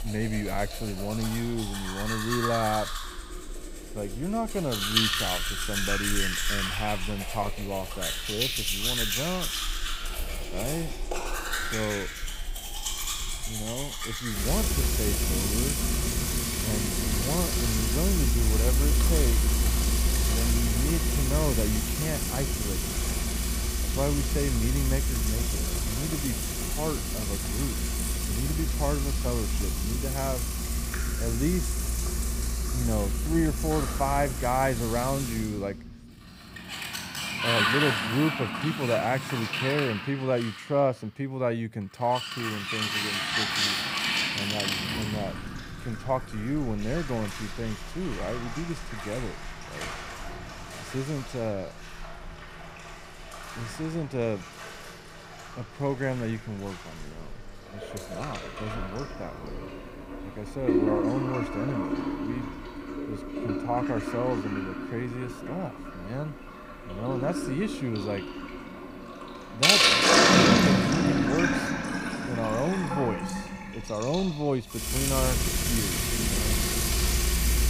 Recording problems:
household noises; very loud; throughout; 4 dB above the speech

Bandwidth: 15.5 kHz